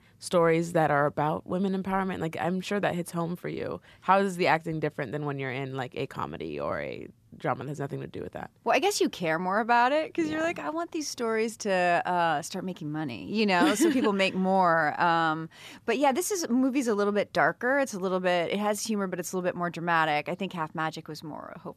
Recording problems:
none

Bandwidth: 14.5 kHz